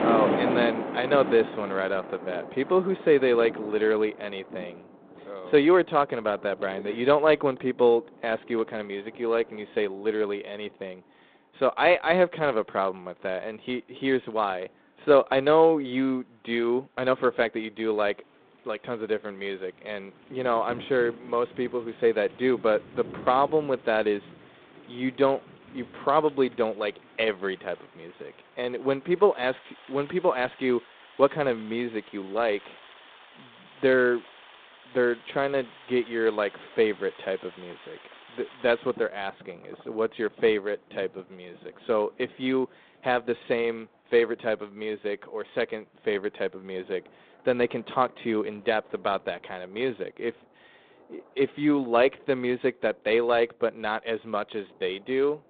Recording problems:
phone-call audio; nothing above 4 kHz
rain or running water; noticeable; throughout; 15 dB below the speech

